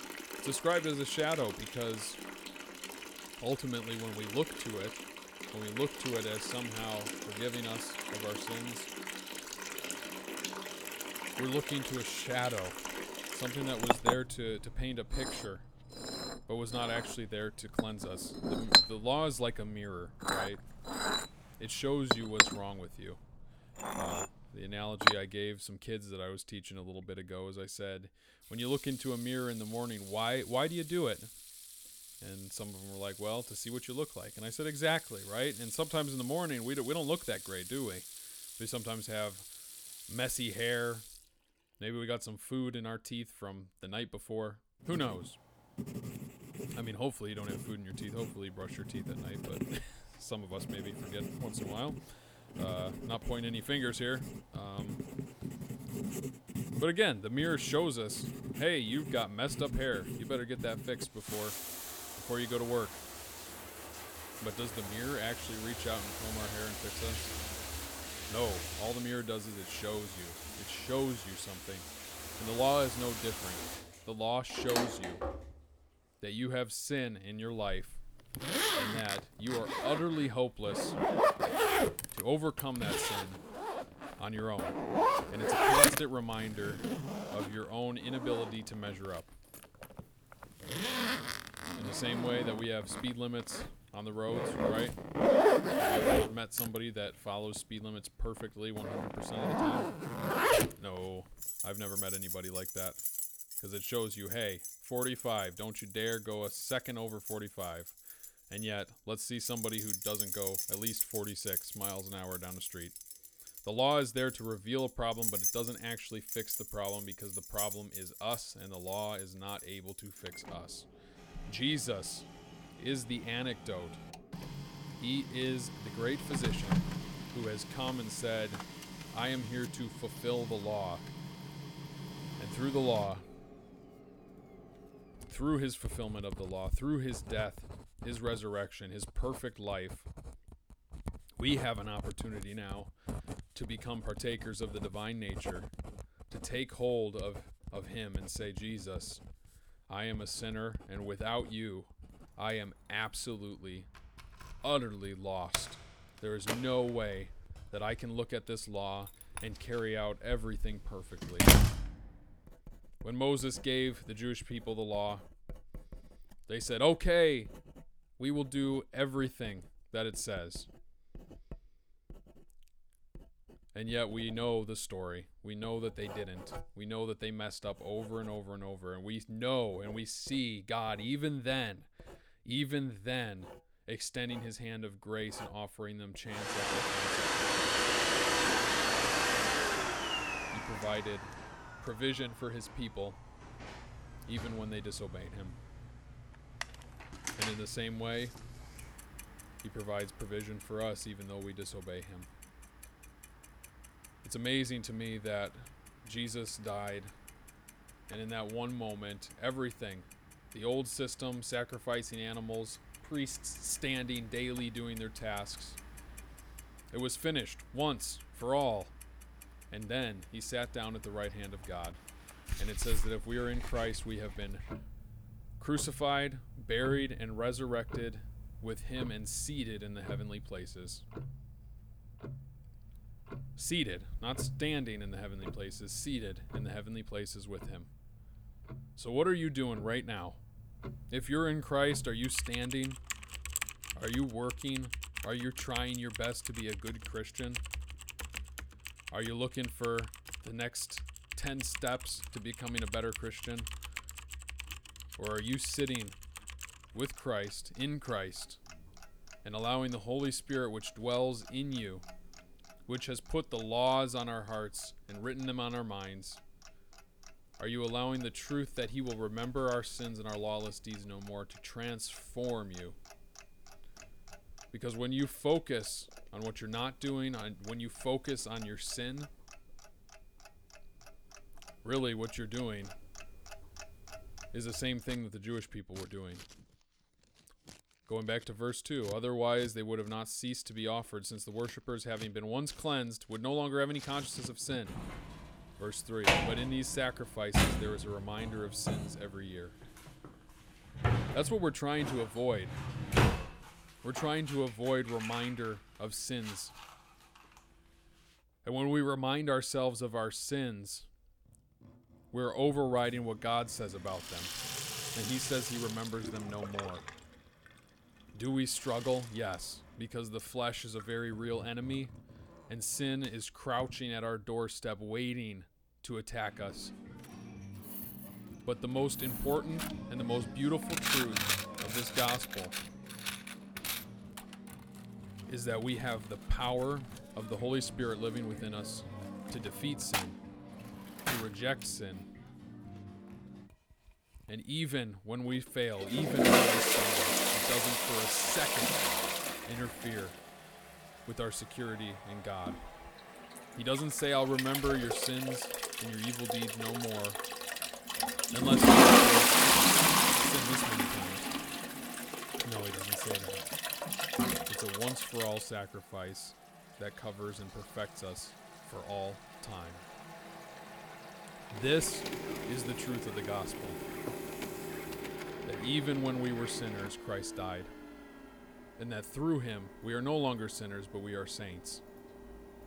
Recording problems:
household noises; very loud; throughout; 3 dB above the speech

